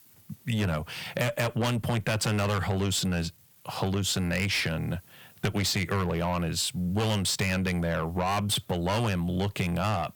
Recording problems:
distortion; heavy; 6 dB below the speech
squashed, flat; somewhat

